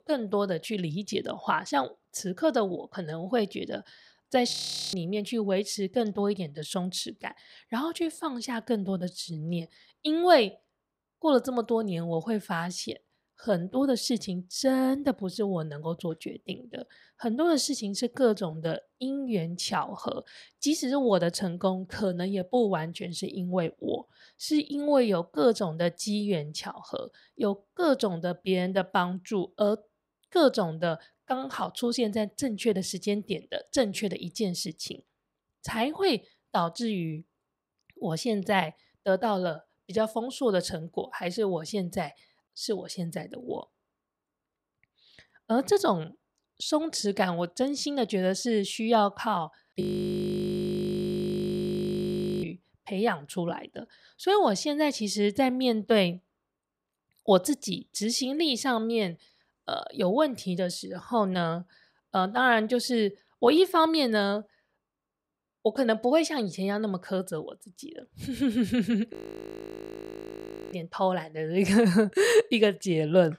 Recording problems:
audio freezing; at 4.5 s, at 50 s for 2.5 s and at 1:09 for 1.5 s

